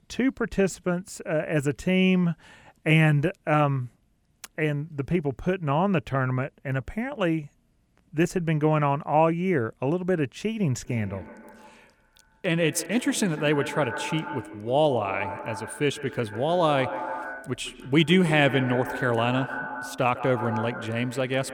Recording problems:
echo of what is said; strong; from 11 s on; 150 ms later, 10 dB below the speech

